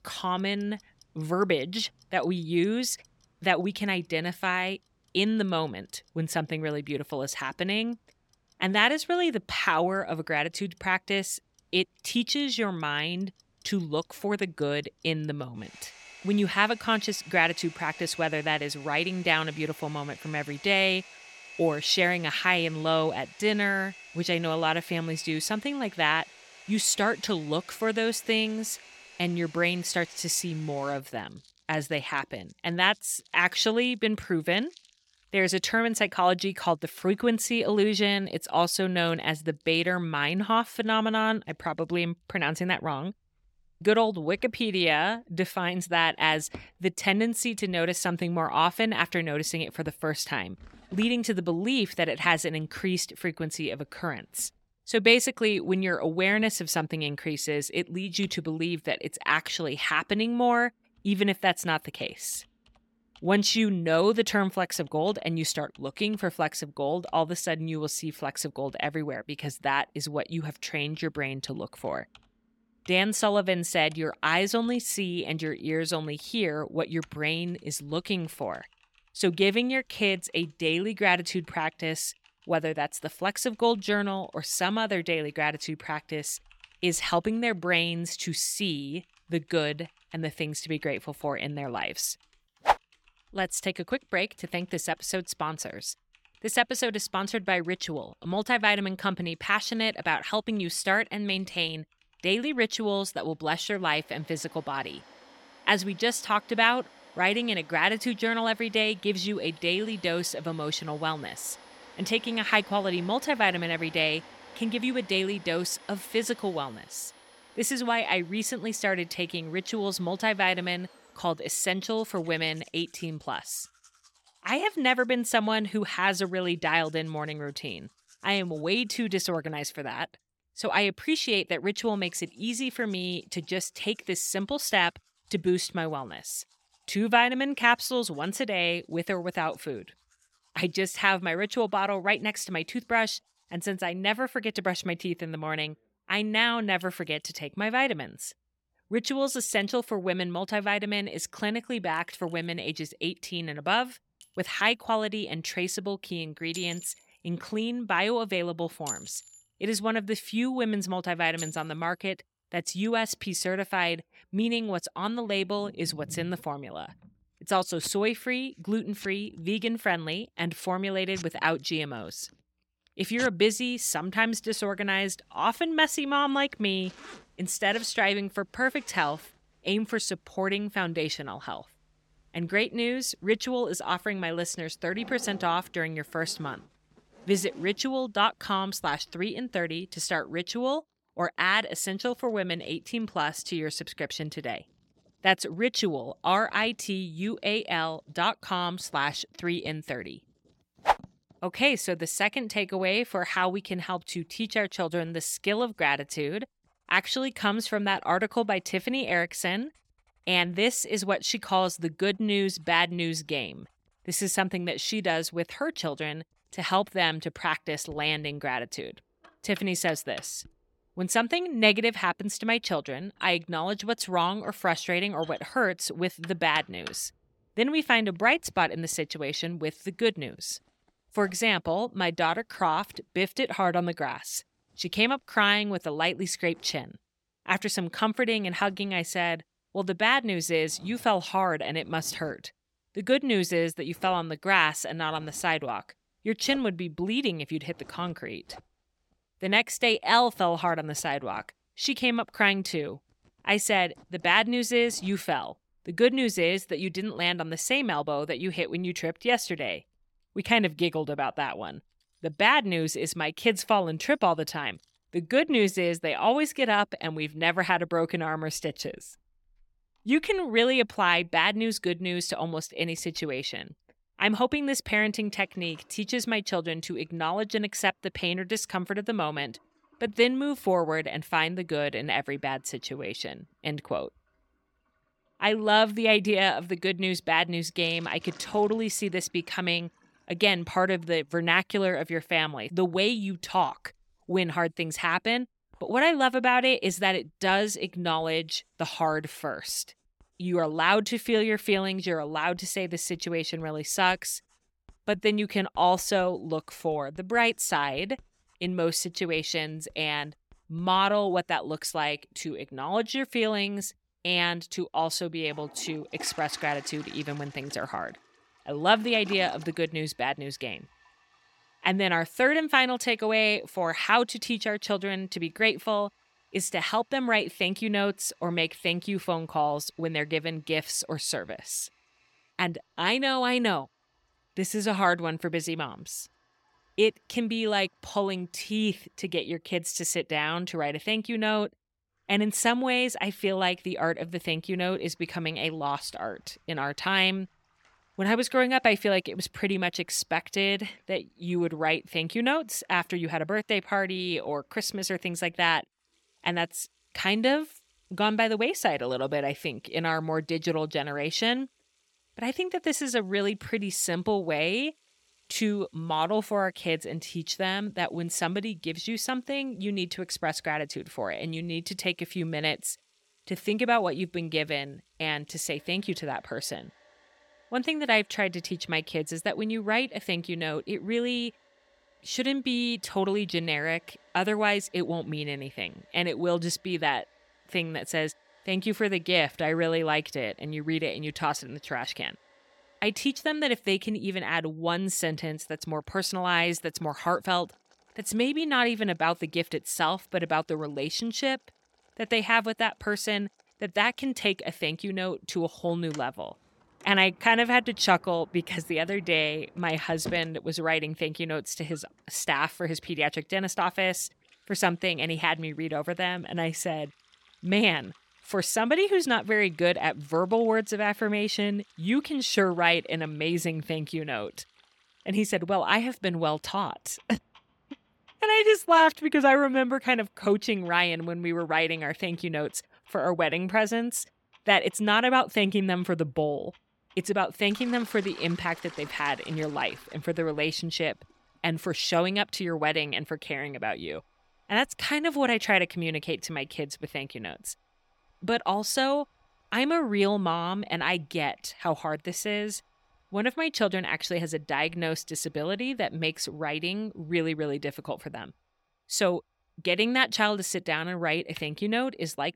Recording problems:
household noises; faint; throughout; 25 dB below the speech

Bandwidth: 17 kHz